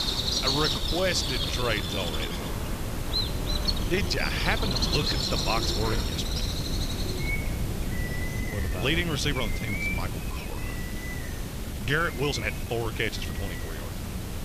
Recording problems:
animal sounds; loud; throughout; 1 dB below the speech
hiss; loud; throughout; 10 dB below the speech
wind noise on the microphone; occasional gusts; 15 dB below the speech
uneven, jittery; strongly; from 0.5 to 13 s

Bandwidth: 14.5 kHz